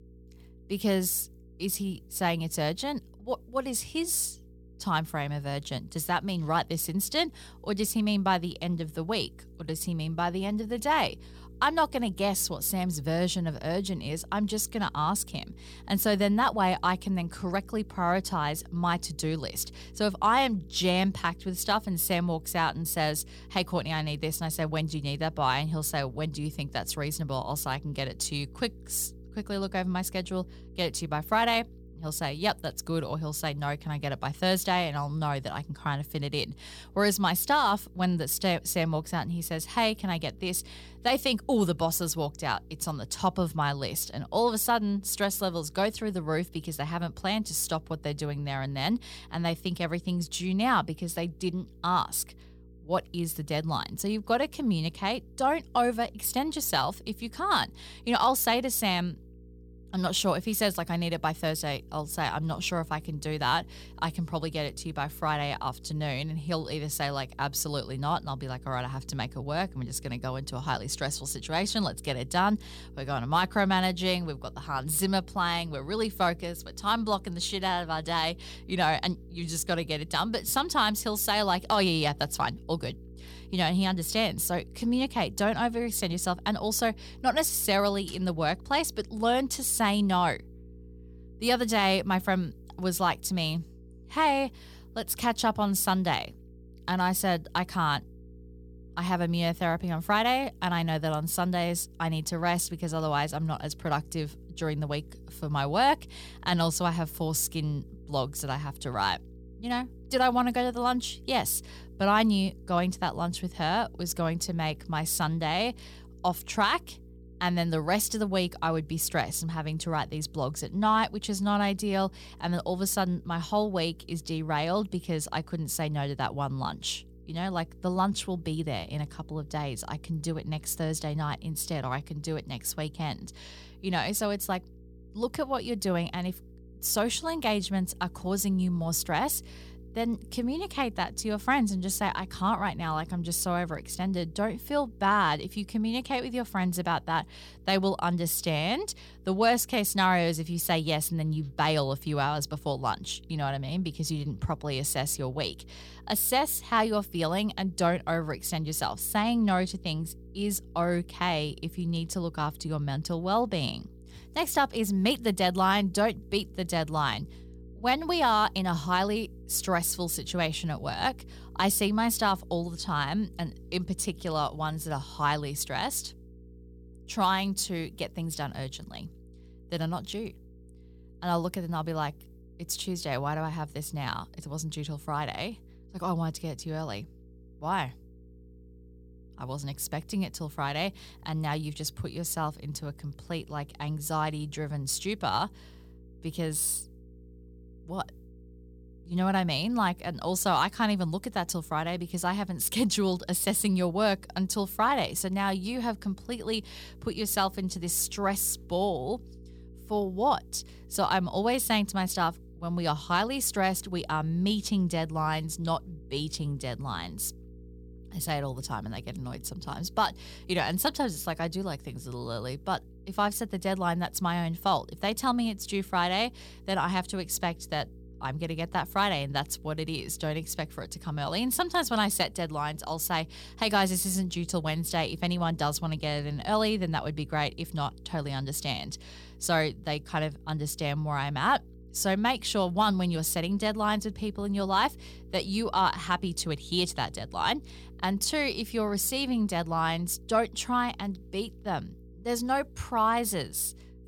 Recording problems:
electrical hum; faint; throughout; 60 Hz, 30 dB below the speech

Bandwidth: 18.5 kHz